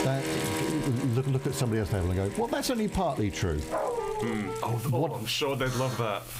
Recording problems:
squashed, flat; heavily, background pumping
background music; loud; until 4.5 s; 9 dB below the speech
household noises; noticeable; throughout; 15 dB below the speech
dog barking; noticeable; at 3.5 s; peak 1 dB below the speech
alarm; noticeable; at 5.5 s; peak 9 dB below the speech

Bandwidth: 15.5 kHz